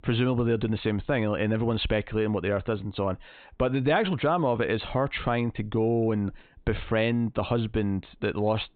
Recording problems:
high frequencies cut off; severe; nothing above 4 kHz

